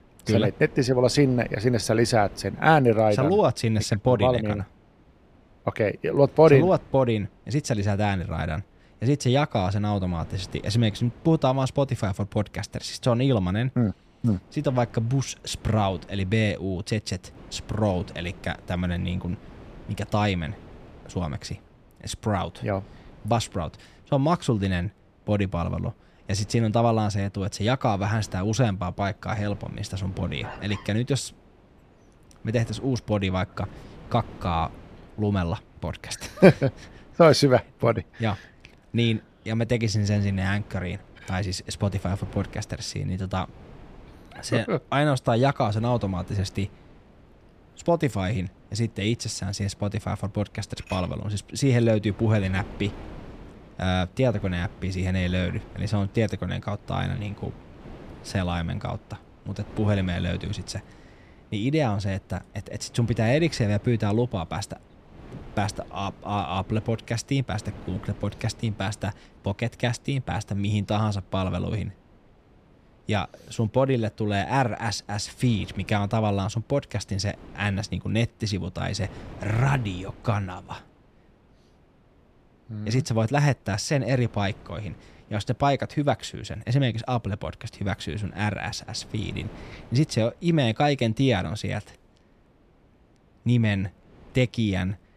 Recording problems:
wind noise on the microphone; occasional gusts; 25 dB below the speech

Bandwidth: 14.5 kHz